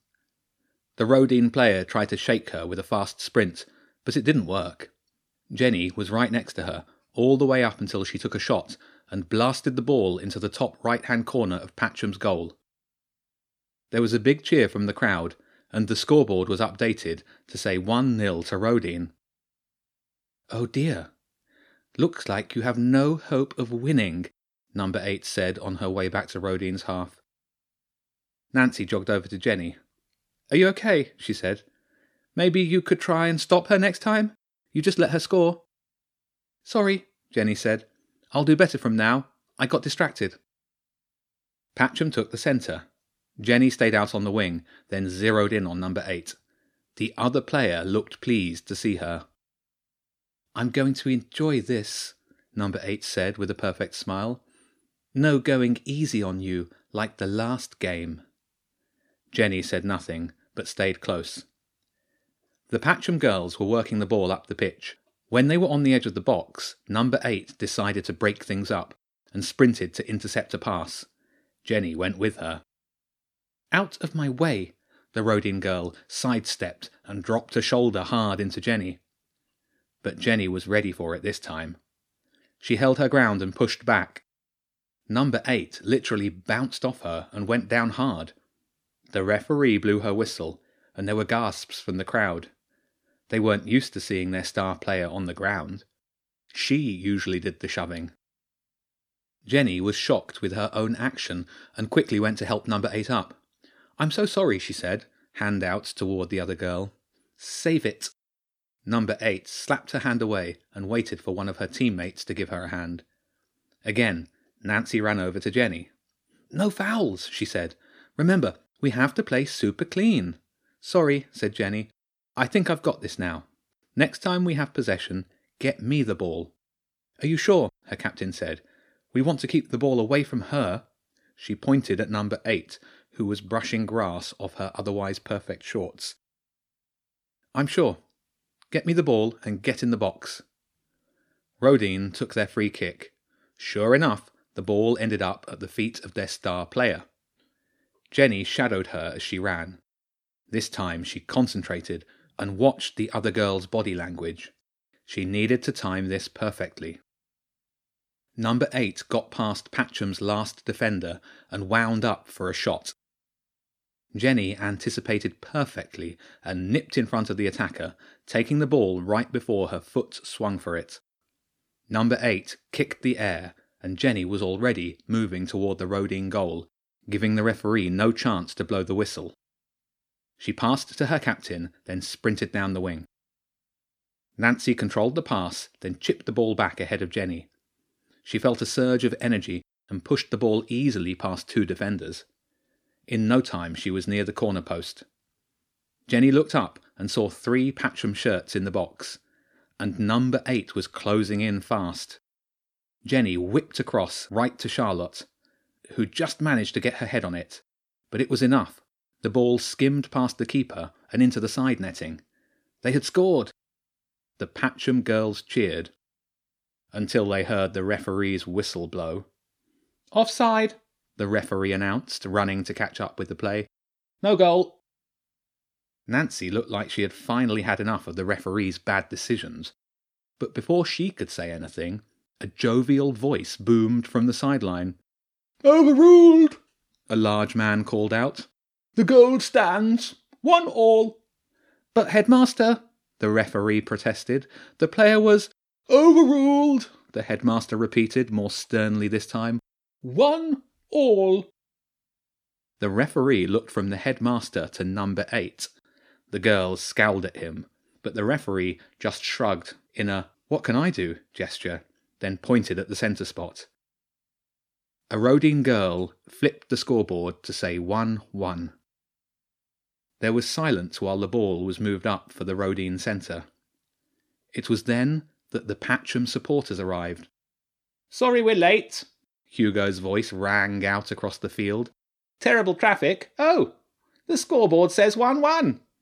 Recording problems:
none

